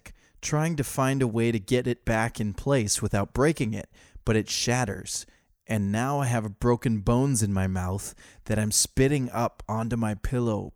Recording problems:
none

